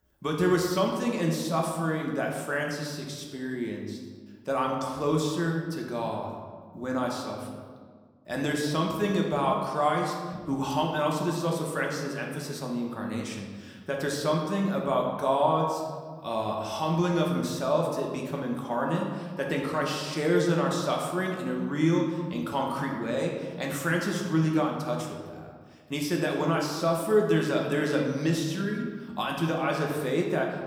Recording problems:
room echo; noticeable; dies away in 1.3 s
off-mic speech; somewhat distant
animal sounds; very faint; from 8 s on; 30 dB below the speech

